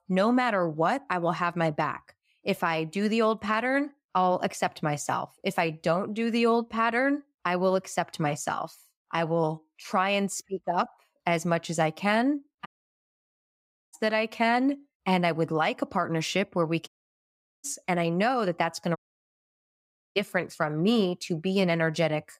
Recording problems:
audio cutting out; at 13 s for 1.5 s, at 17 s for 1 s and at 19 s for 1 s

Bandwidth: 15.5 kHz